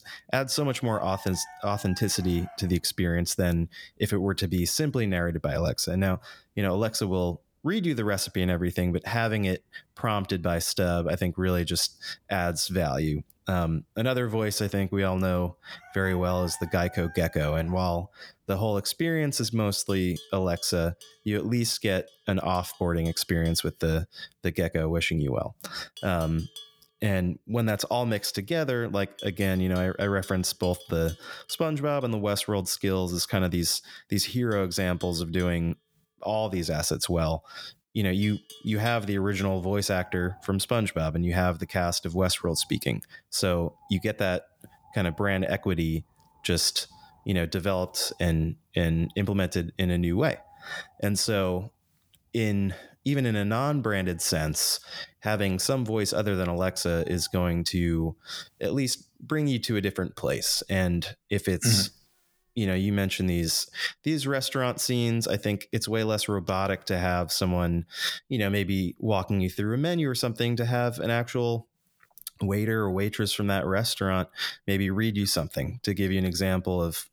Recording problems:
animal sounds; faint; throughout; 20 dB below the speech

